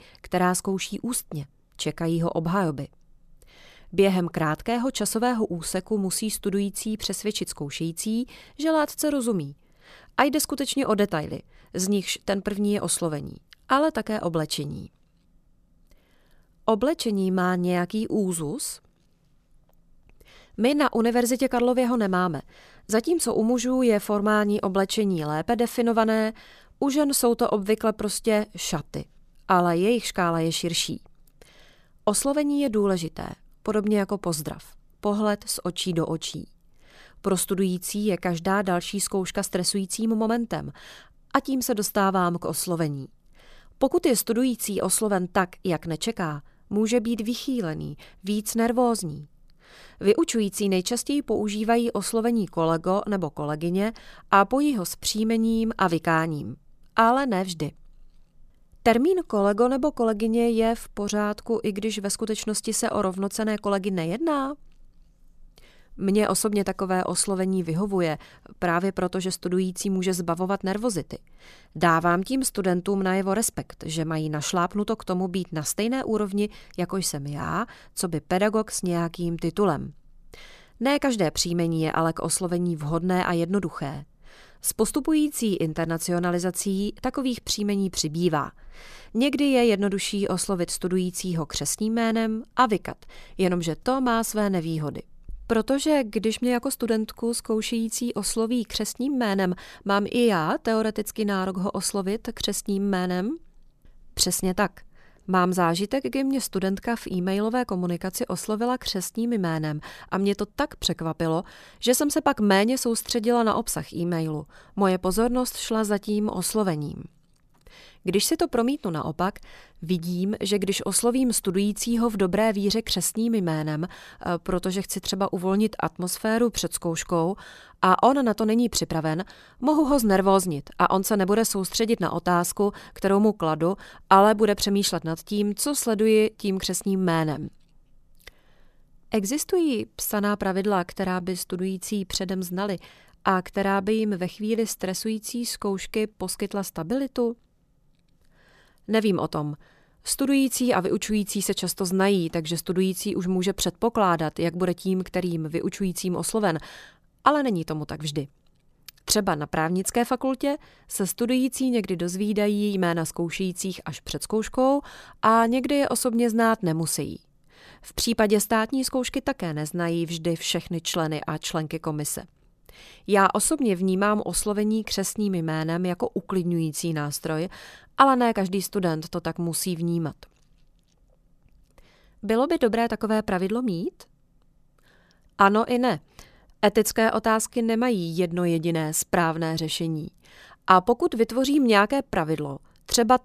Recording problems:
none

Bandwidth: 14.5 kHz